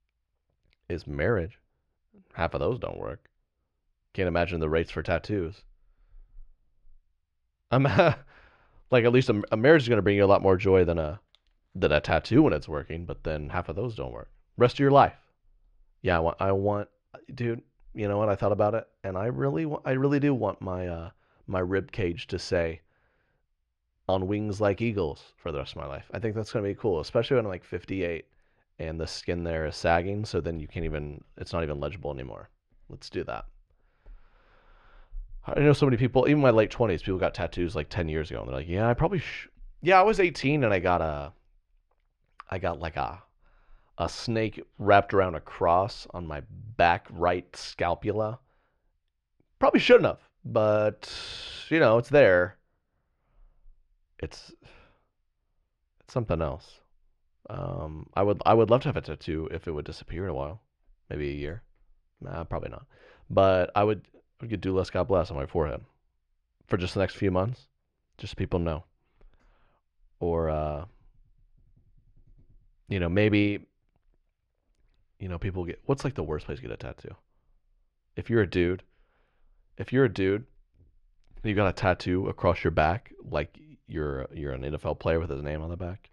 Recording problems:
muffled; slightly; fading above 2.5 kHz

